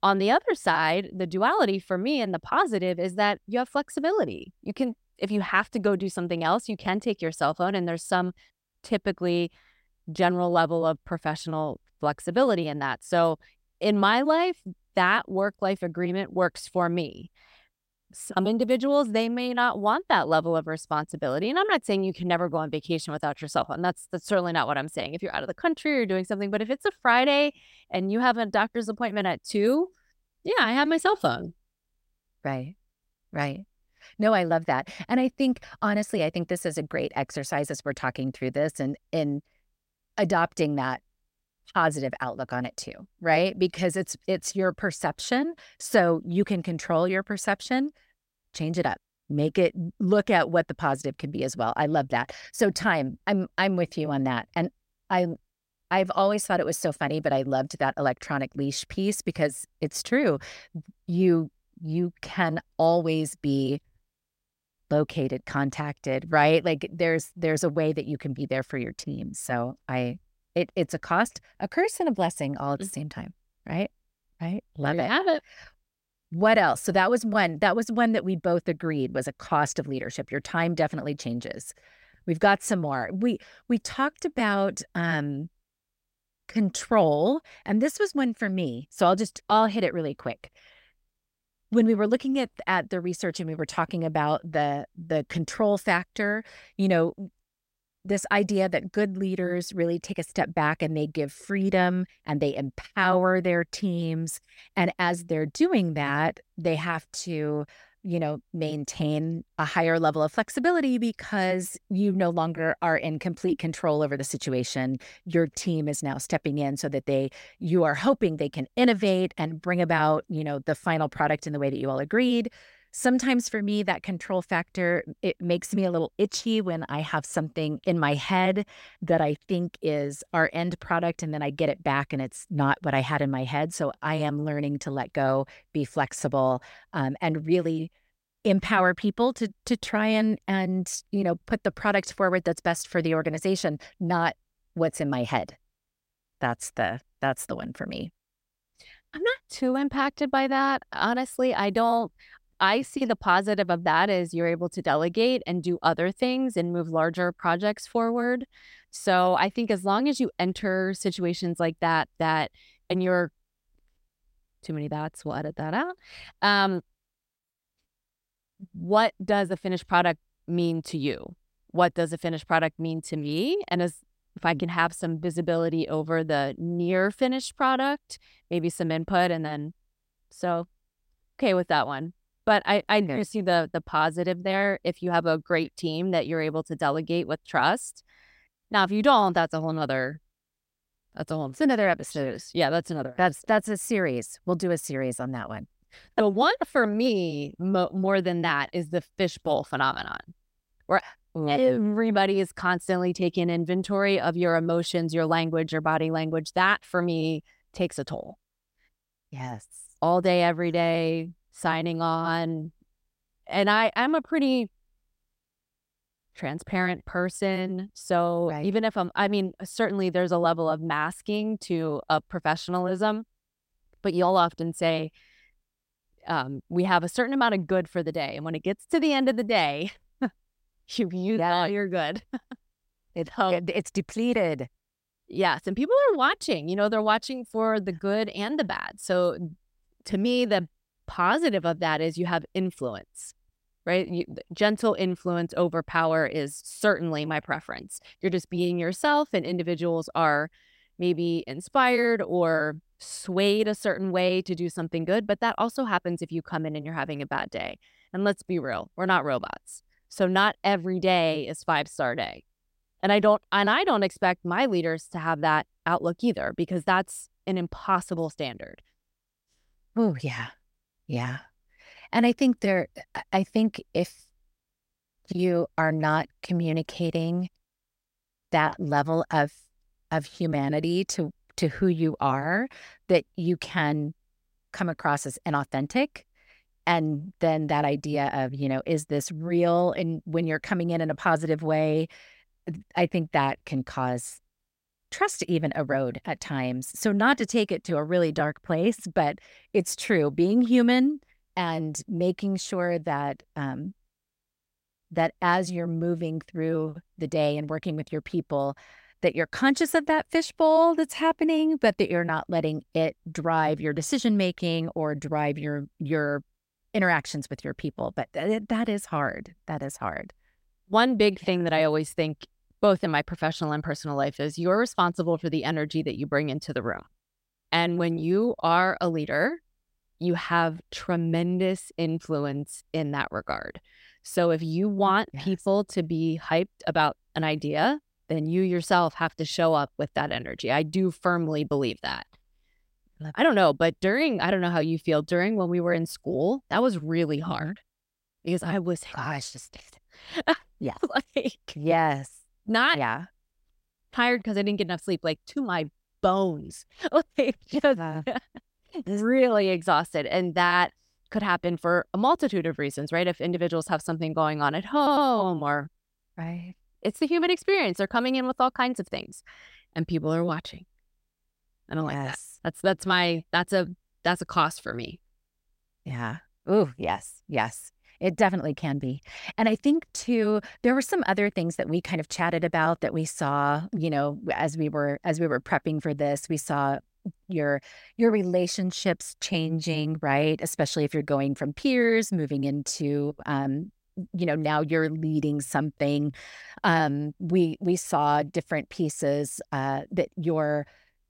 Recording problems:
audio stuttering; at 6:05

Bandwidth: 16 kHz